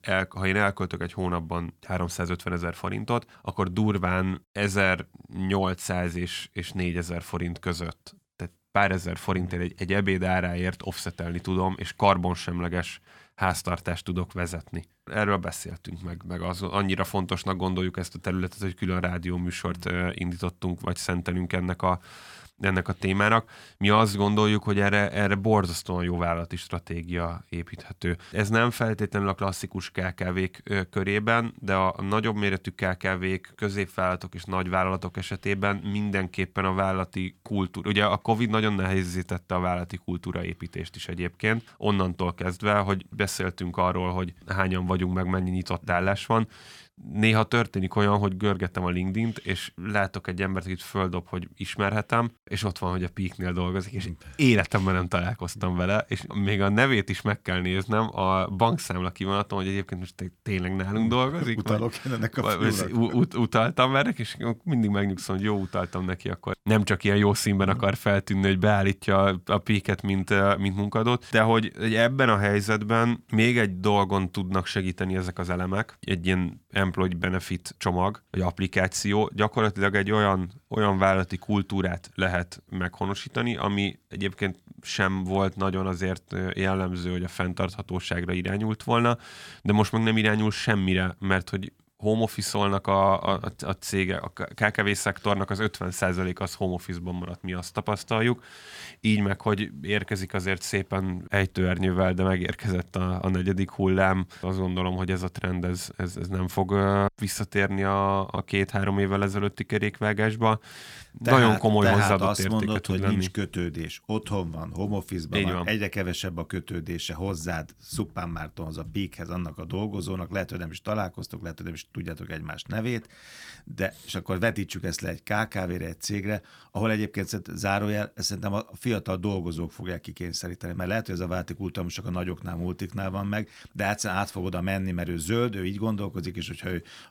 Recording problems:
none

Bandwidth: 17.5 kHz